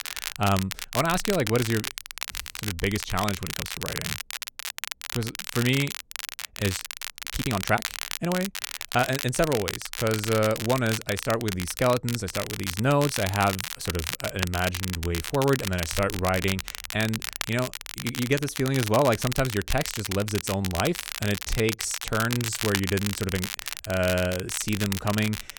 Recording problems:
crackle, like an old record; loud; 5 dB below the speech
uneven, jittery; strongly; from 2.5 to 25 s

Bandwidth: 17.5 kHz